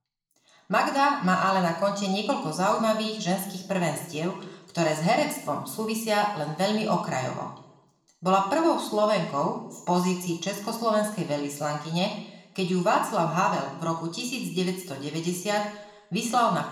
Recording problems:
room echo; noticeable; dies away in 0.8 s
off-mic speech; somewhat distant

